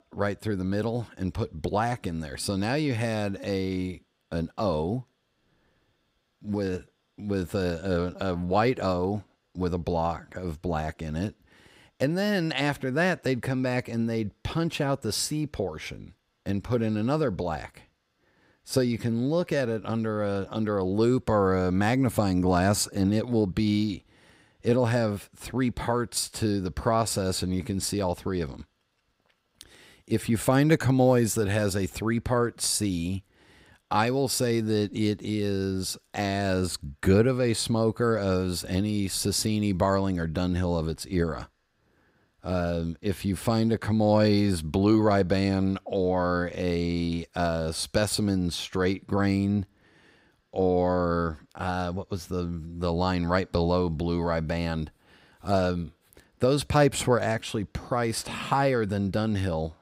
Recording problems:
none

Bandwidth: 15.5 kHz